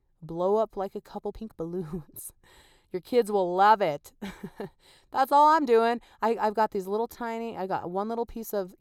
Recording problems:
uneven, jittery; slightly; from 1 to 7.5 s

